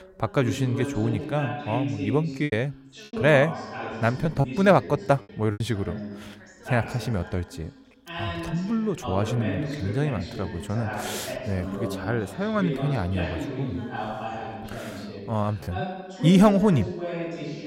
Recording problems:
background chatter; loud; throughout; 2 voices, 8 dB below the speech
choppy; very; from 2.5 to 5.5 s; 6% of the speech affected

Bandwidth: 16 kHz